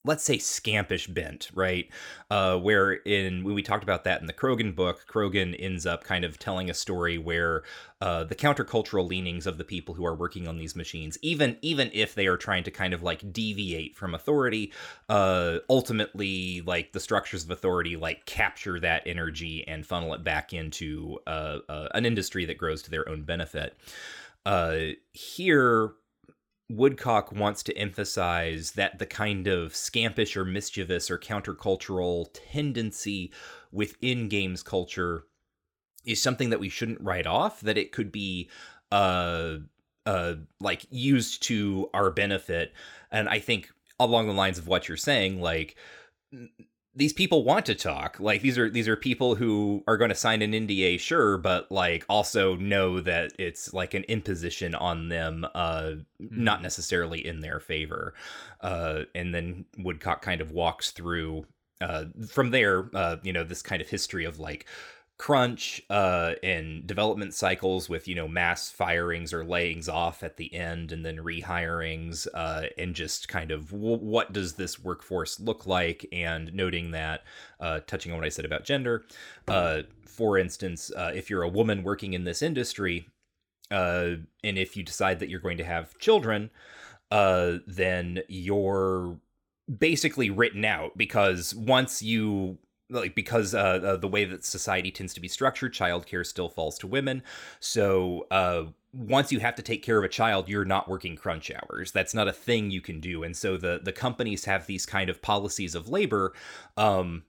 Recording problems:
none

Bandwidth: 19 kHz